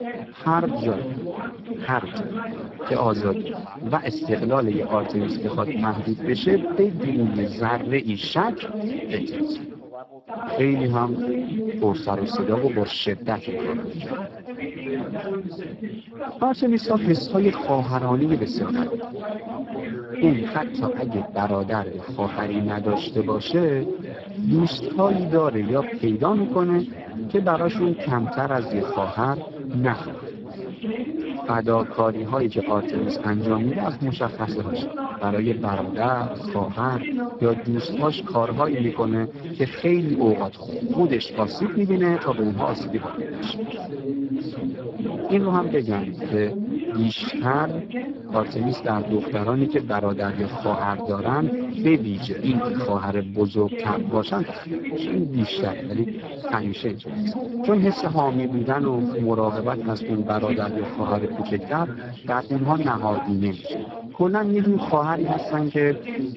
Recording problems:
garbled, watery; badly
background chatter; loud; throughout; 4 voices, 6 dB below the speech

